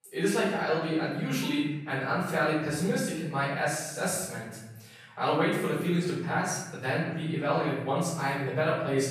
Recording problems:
off-mic speech; far
room echo; noticeable; dies away in 1 s

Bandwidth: 14.5 kHz